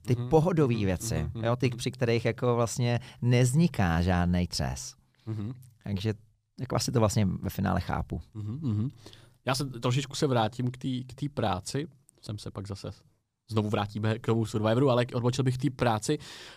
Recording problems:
uneven, jittery; strongly; from 1.5 to 16 s

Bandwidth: 15 kHz